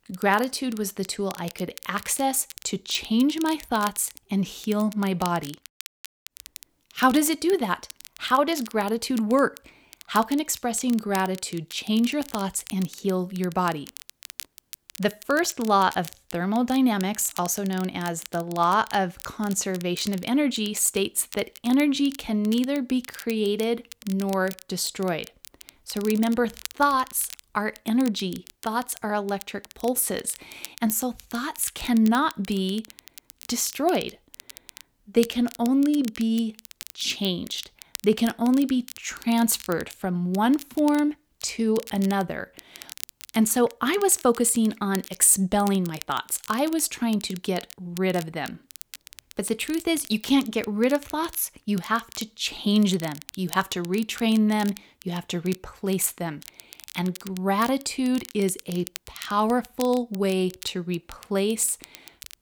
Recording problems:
crackle, like an old record; noticeable; 20 dB below the speech

